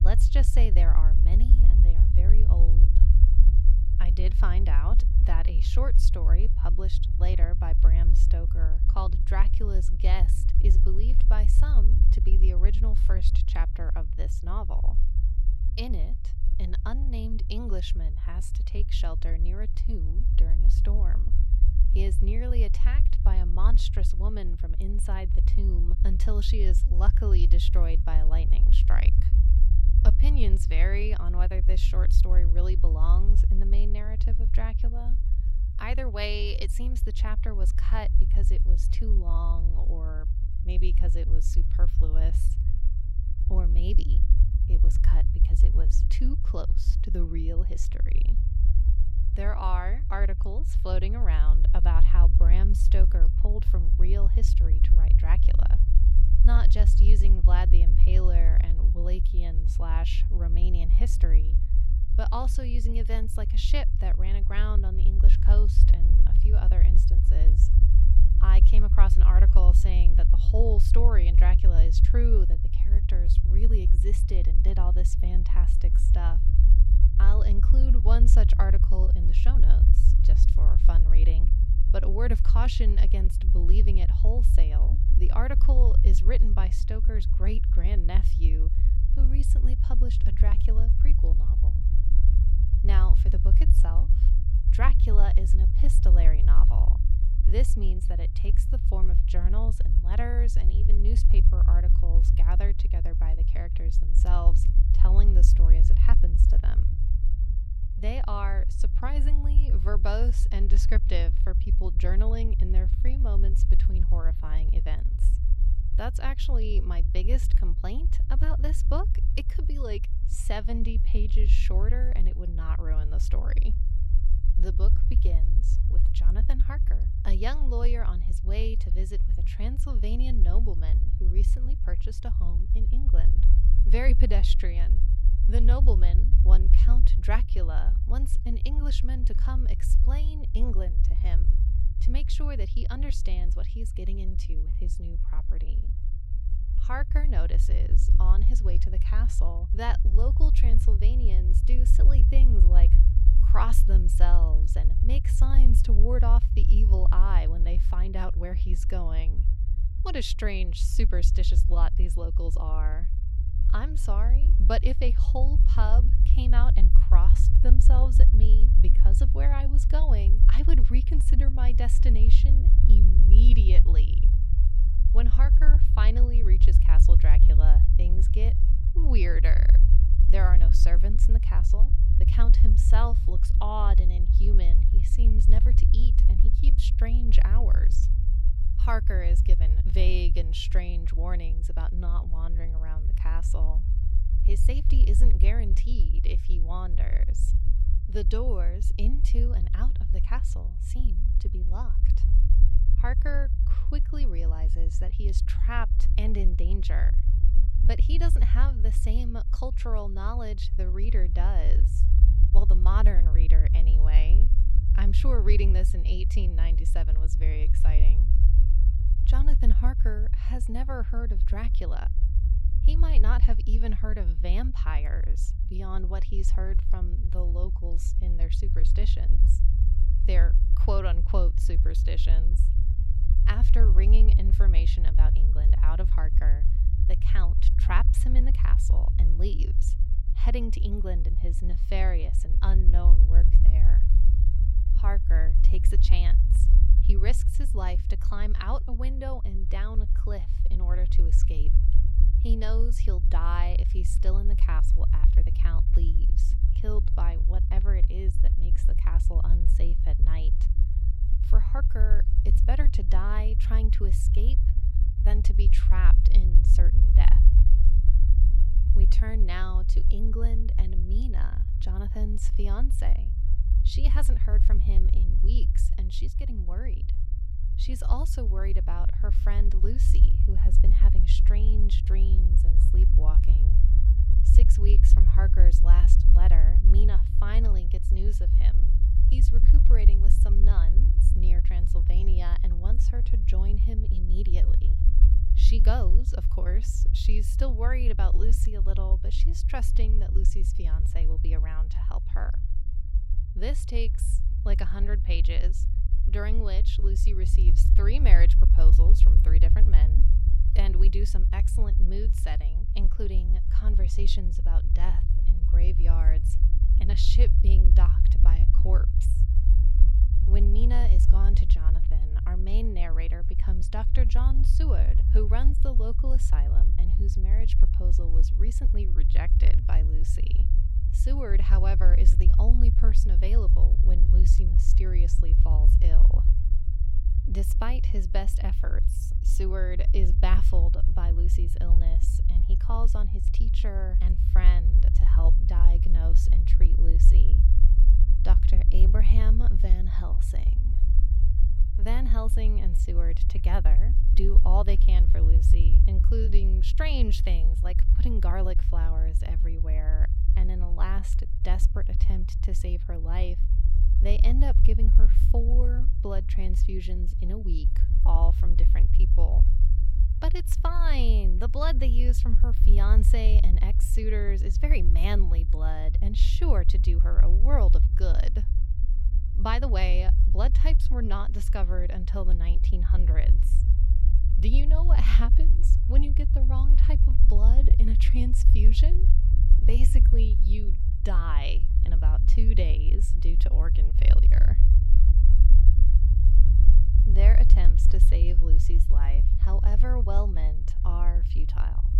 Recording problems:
low rumble; loud; throughout; 6 dB below the speech

